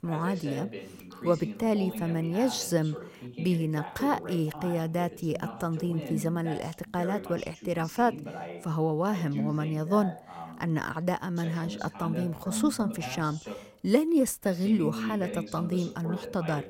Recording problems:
voice in the background; loud; throughout; 9 dB below the speech

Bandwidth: 16 kHz